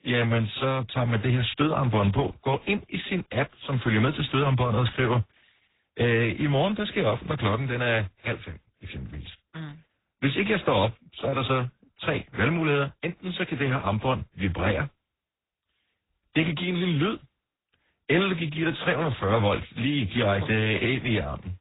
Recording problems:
garbled, watery; badly
high frequencies cut off; severe; nothing above 4 kHz

